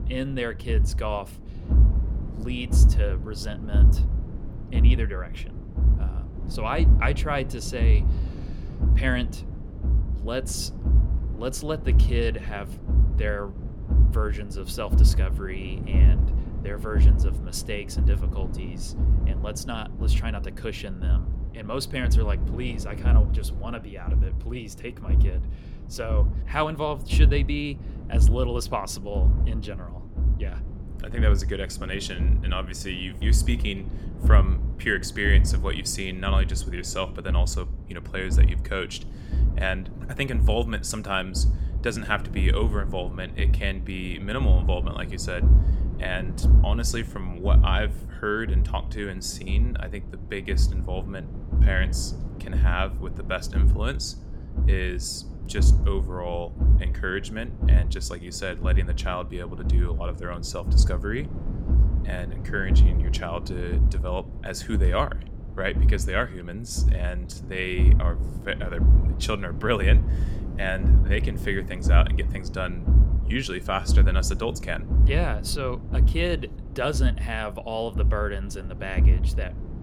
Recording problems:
low rumble; noticeable; throughout; 10 dB below the speech

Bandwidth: 17 kHz